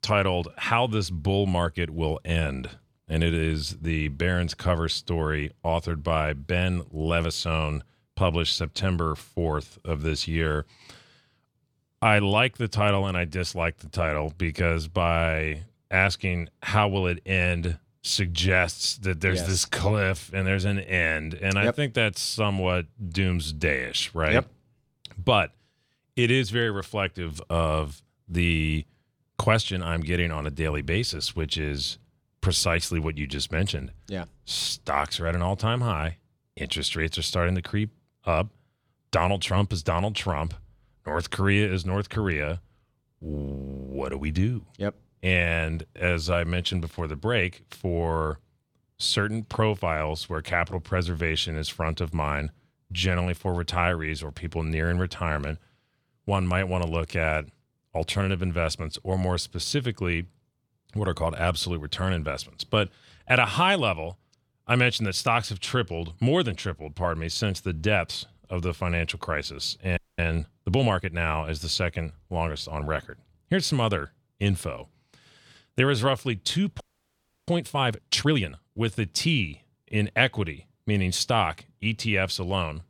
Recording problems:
audio freezing; at 1:10 and at 1:17 for 0.5 s

